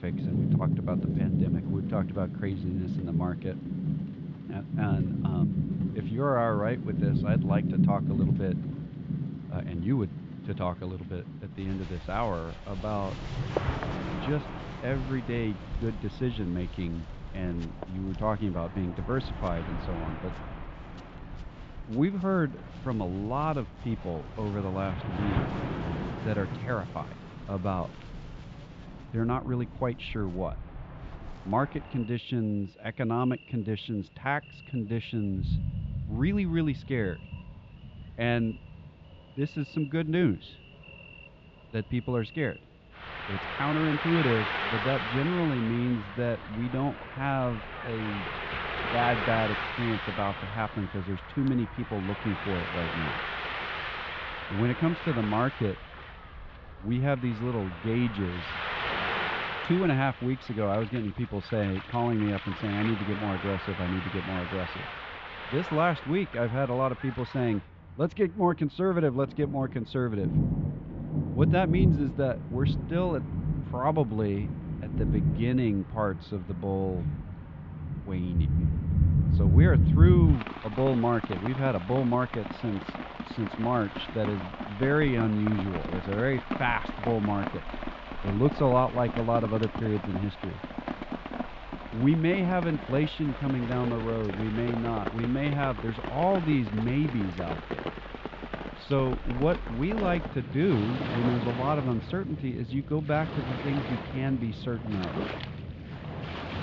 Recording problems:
muffled; very slightly; fading above 3.5 kHz
high frequencies cut off; slight; nothing above 7.5 kHz
rain or running water; loud; throughout; 3 dB below the speech

